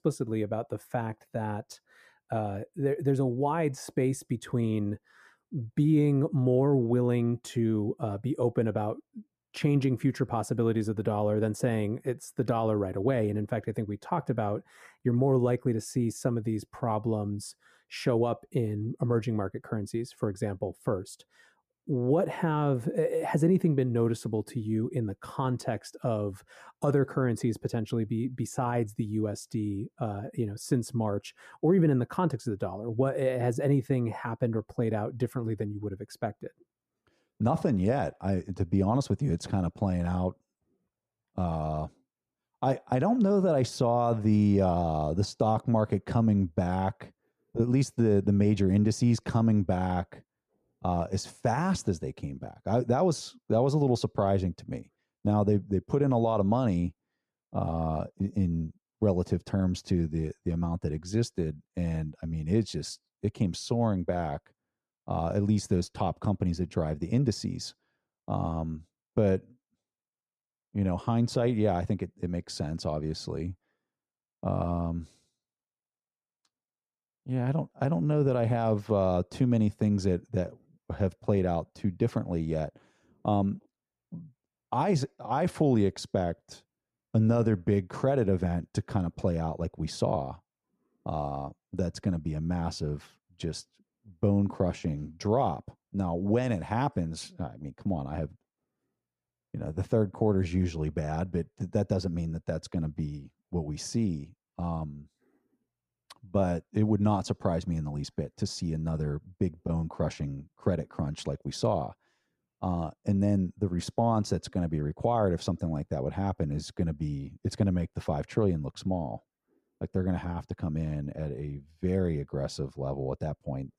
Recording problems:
muffled; slightly; fading above 1.5 kHz

